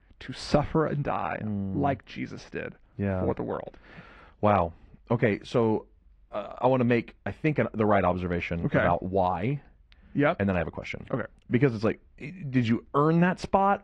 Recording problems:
muffled; slightly; fading above 2.5 kHz
garbled, watery; slightly

